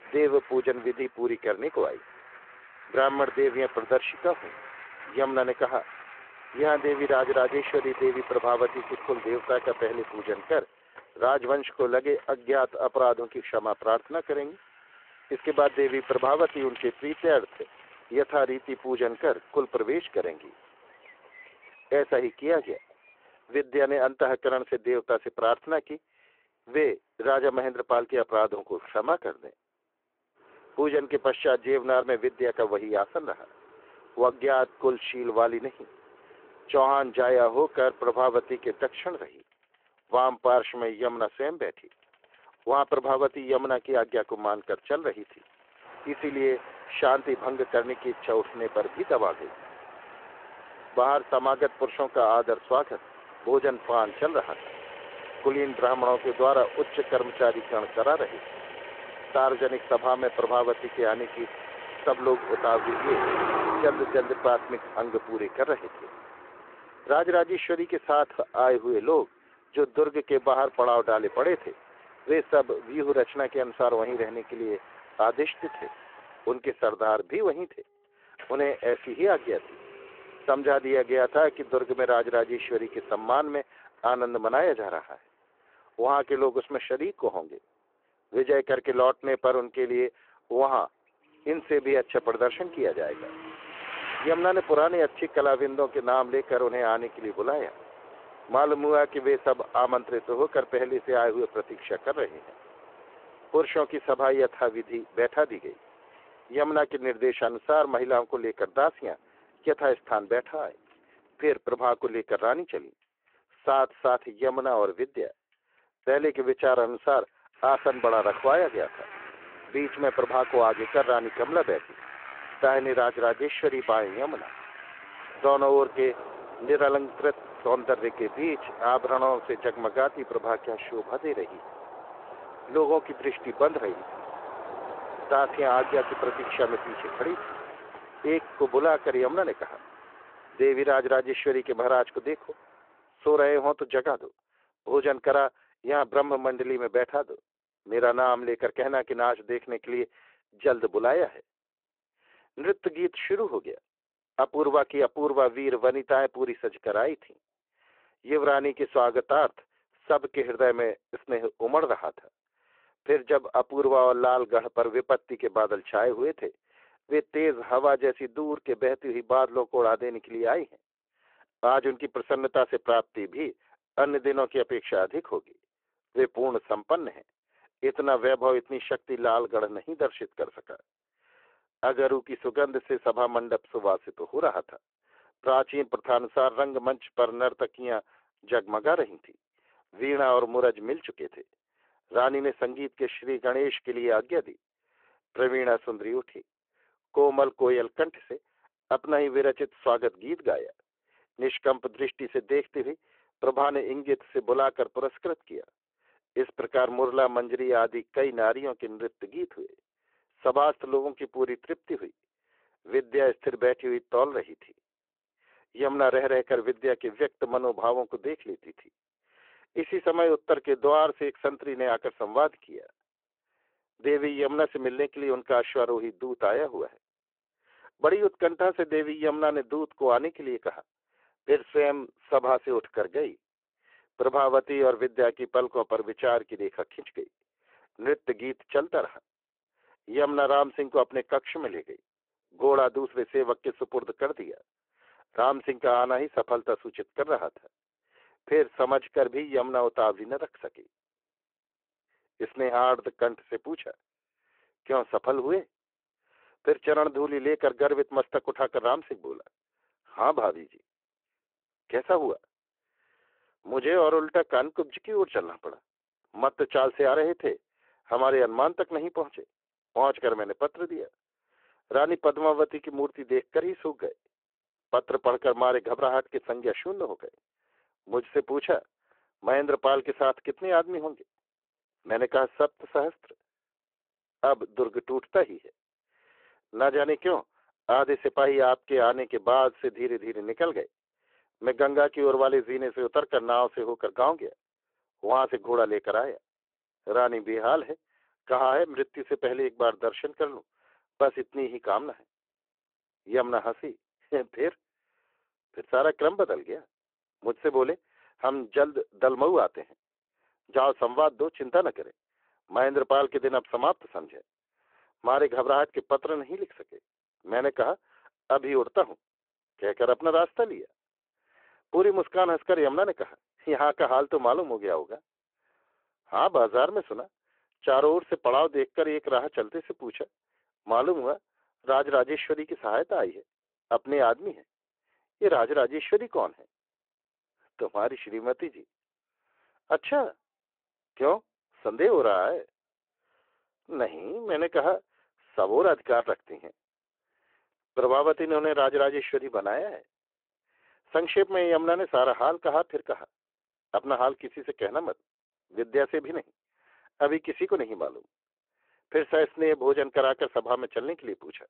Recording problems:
phone-call audio
traffic noise; noticeable; until 2:23; 15 dB below the speech

